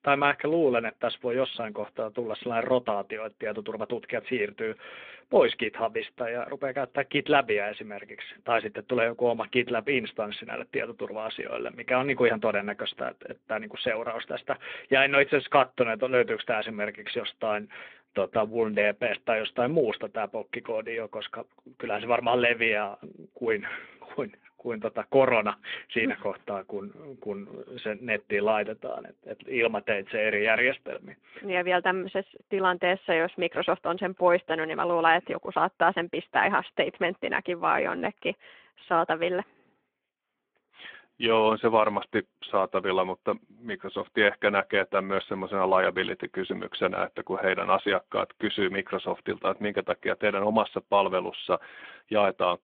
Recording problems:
phone-call audio

